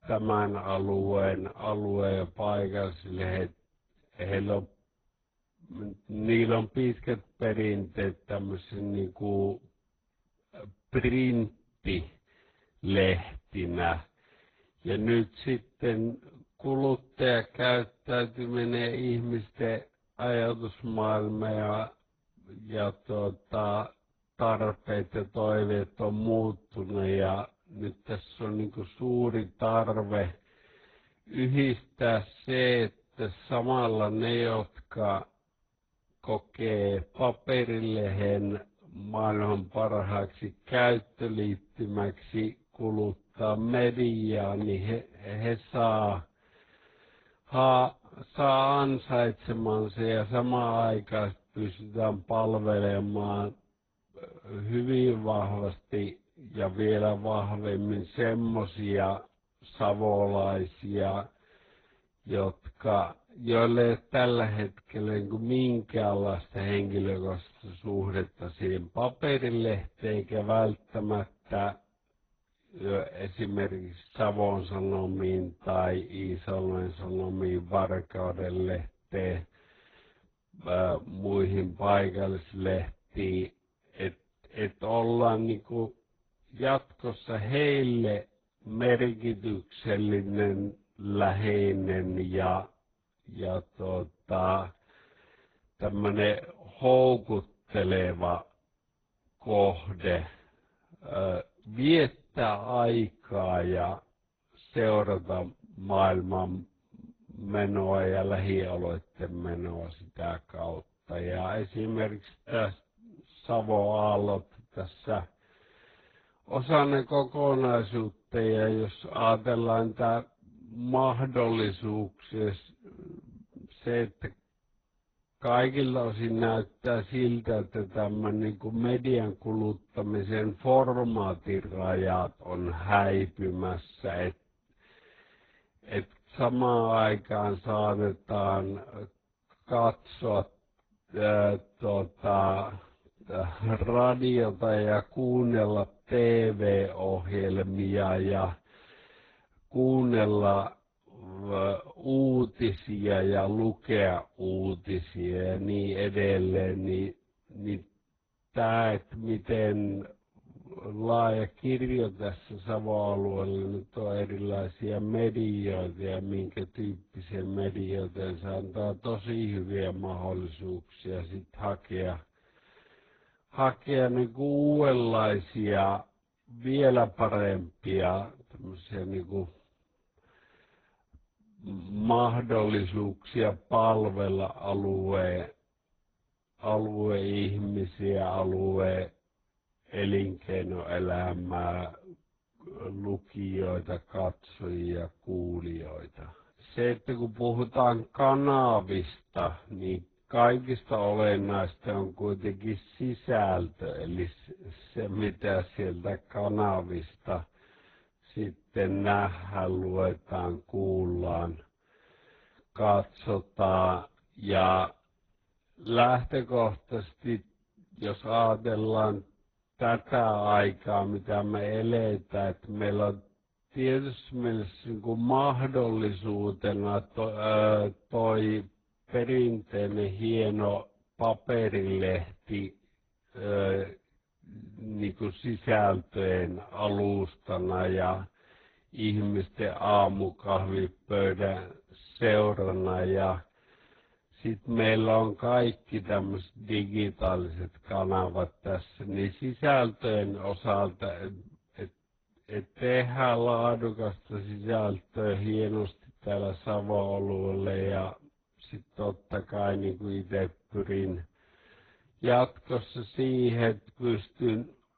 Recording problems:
garbled, watery; badly; nothing above 4 kHz
wrong speed, natural pitch; too slow; 0.5 times normal speed

